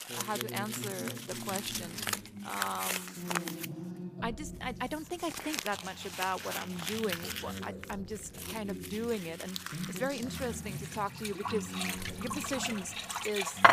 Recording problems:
household noises; very loud; throughout; 1 dB above the speech
voice in the background; loud; throughout; 6 dB below the speech

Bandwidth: 15 kHz